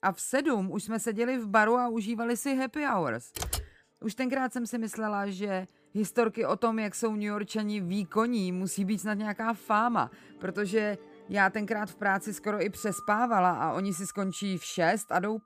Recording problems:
background music; faint; throughout; 20 dB below the speech
keyboard typing; noticeable; at 3.5 s; peak 4 dB below the speech

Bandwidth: 15 kHz